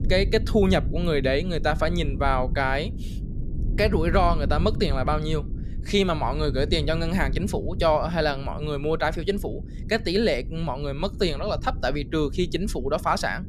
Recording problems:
low rumble; noticeable; throughout; 20 dB below the speech

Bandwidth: 14.5 kHz